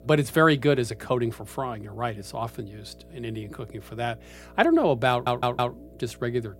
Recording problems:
electrical hum; faint; throughout; 60 Hz, 30 dB below the speech
audio stuttering; at 5 s

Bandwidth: 16 kHz